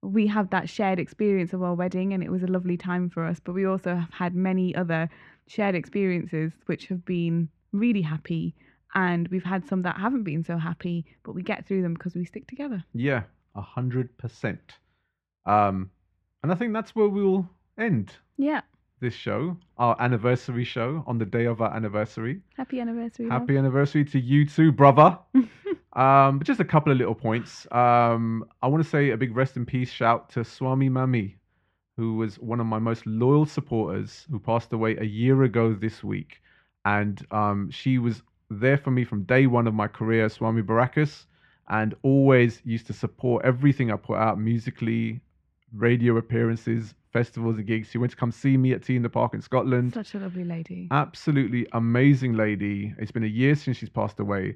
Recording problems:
muffled; slightly; fading above 2.5 kHz

